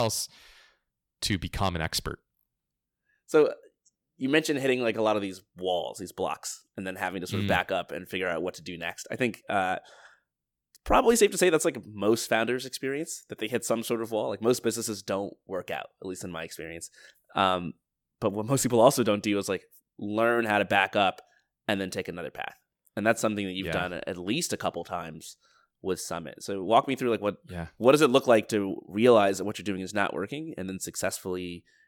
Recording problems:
abrupt cut into speech; at the start

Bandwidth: 18.5 kHz